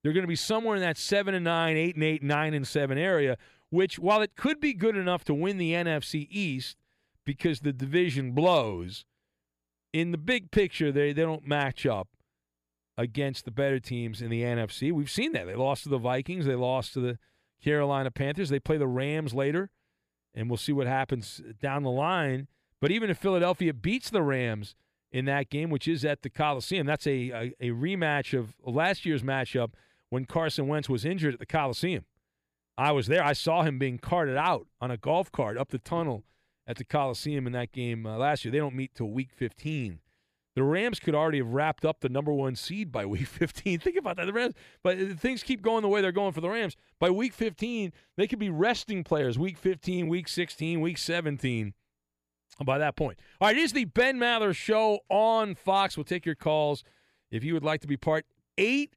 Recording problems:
none

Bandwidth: 15 kHz